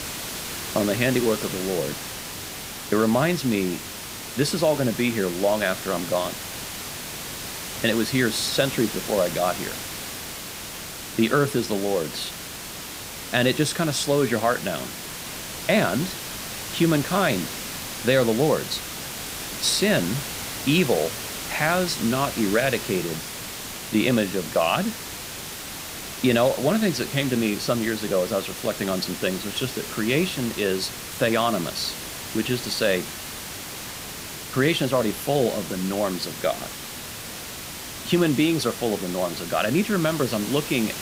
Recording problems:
hiss; loud; throughout; 8 dB below the speech

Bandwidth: 15.5 kHz